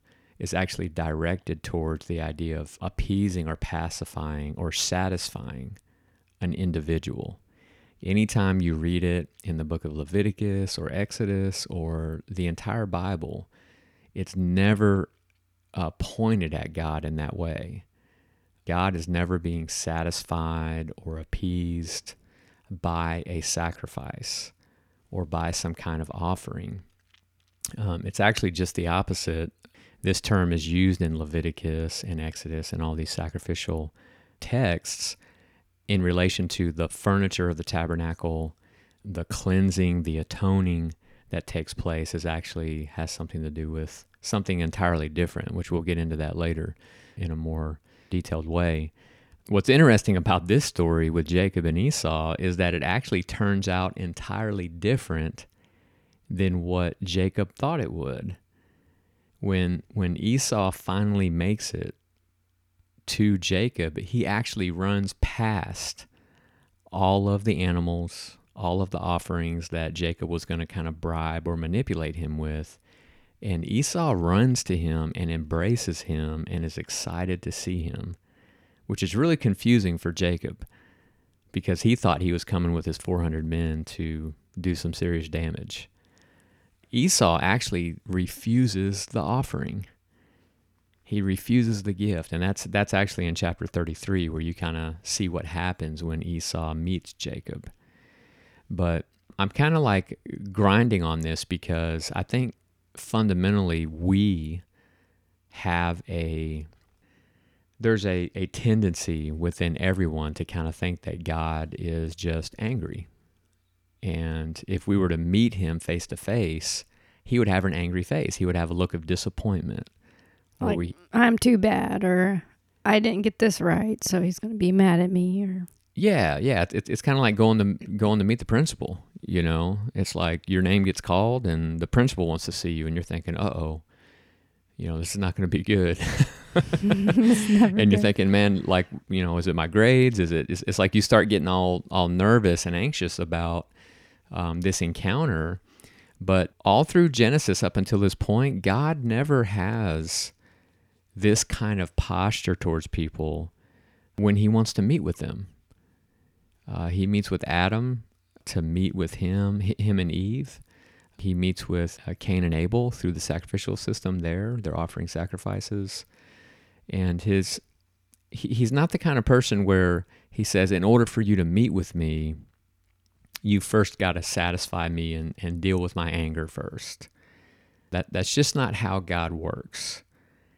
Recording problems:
none

